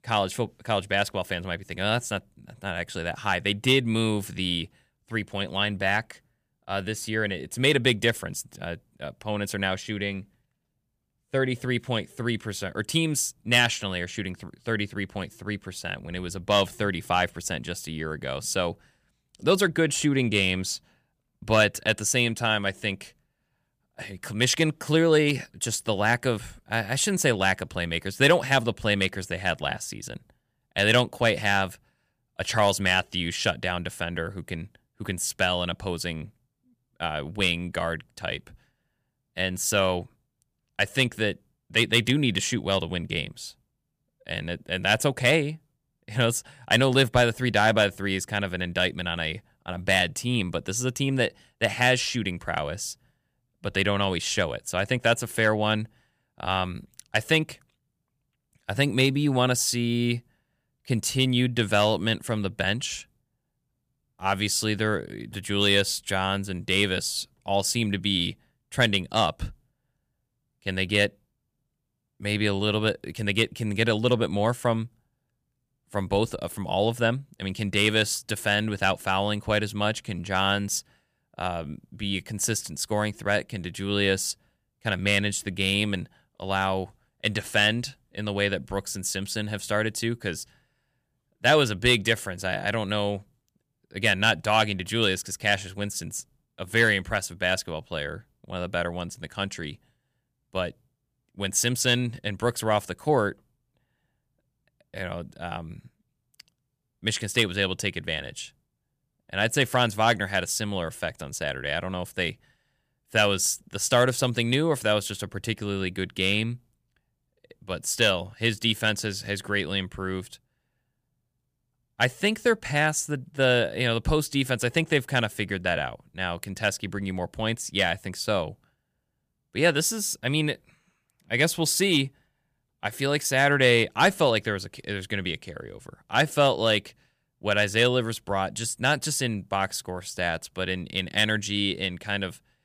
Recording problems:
none

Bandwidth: 15 kHz